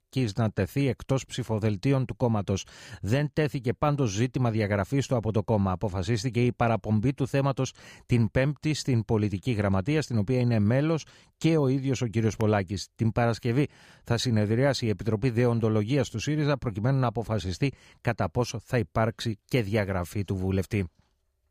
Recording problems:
none

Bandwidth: 15 kHz